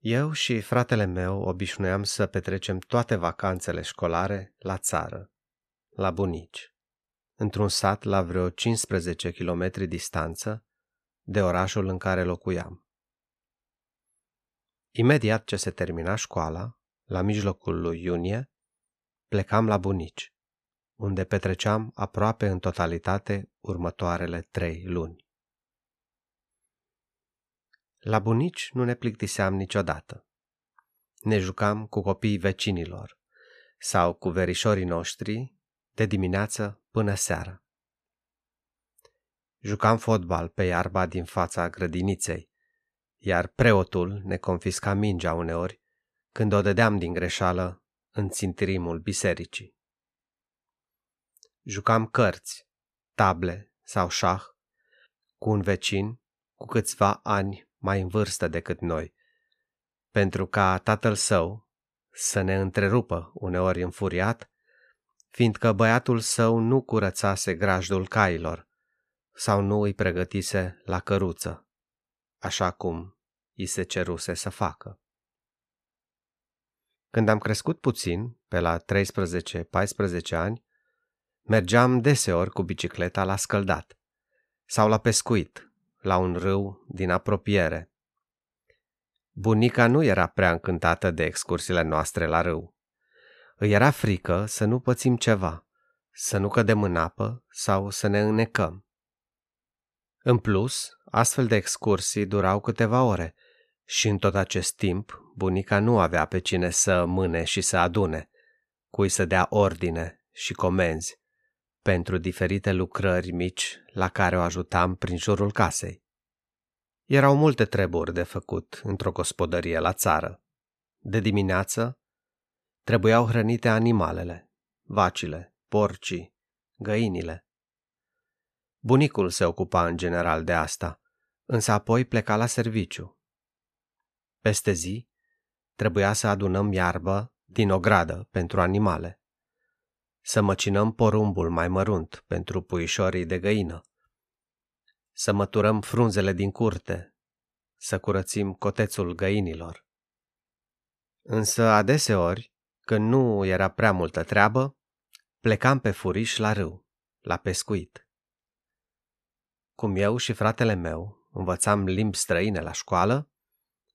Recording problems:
none

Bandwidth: 14 kHz